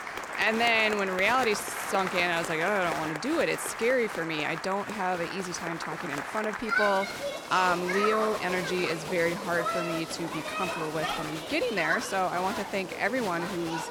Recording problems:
crowd noise; loud; throughout; 5 dB below the speech

